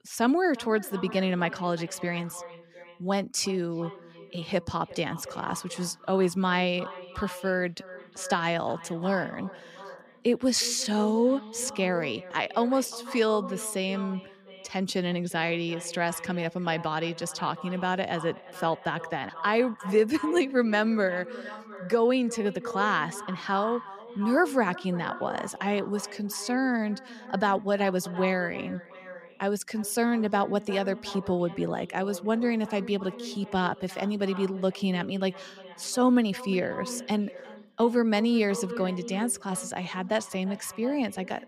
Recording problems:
echo of what is said; noticeable; throughout; 350 ms later, 15 dB below the speech

